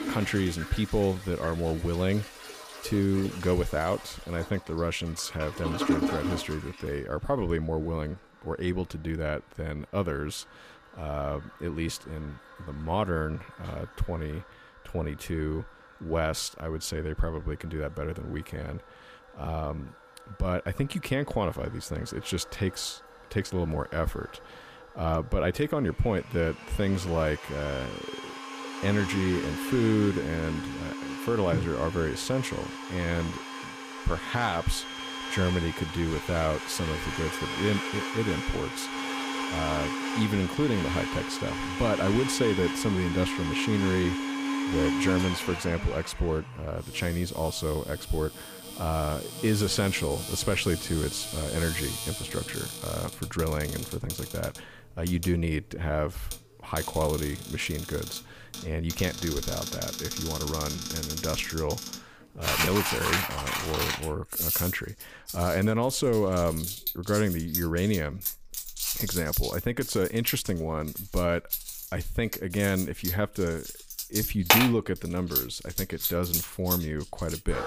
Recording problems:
household noises; loud; throughout; 3 dB below the speech

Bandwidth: 15 kHz